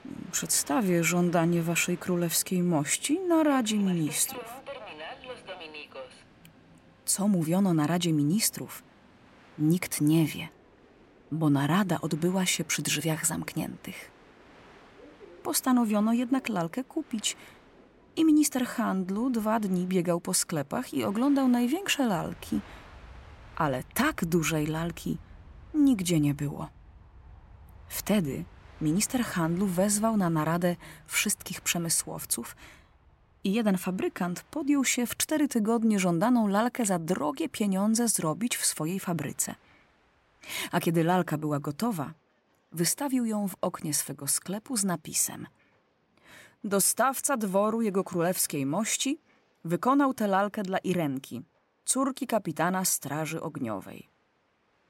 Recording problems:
train or aircraft noise; faint; throughout; 25 dB below the speech

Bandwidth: 16 kHz